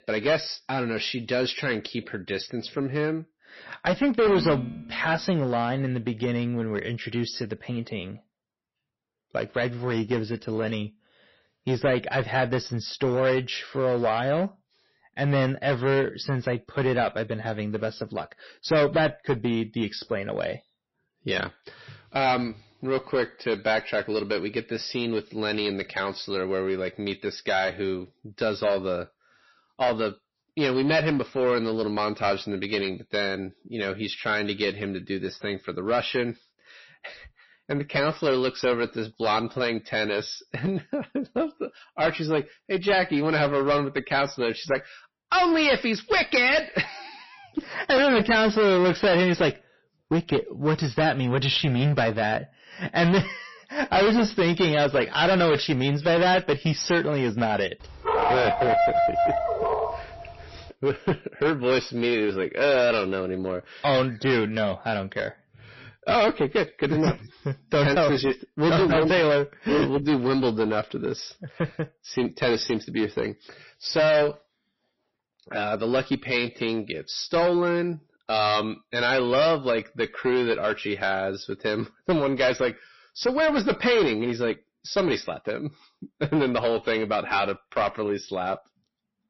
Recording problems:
distortion; heavy; 9% of the sound clipped
garbled, watery; slightly; nothing above 5.5 kHz
clattering dishes; noticeable; at 4.5 s; peak 7 dB below the speech
dog barking; loud; from 58 s to 1:00; peak 4 dB above the speech

